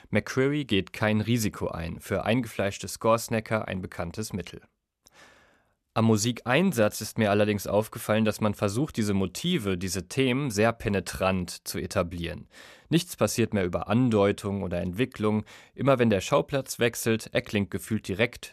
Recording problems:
none

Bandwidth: 14.5 kHz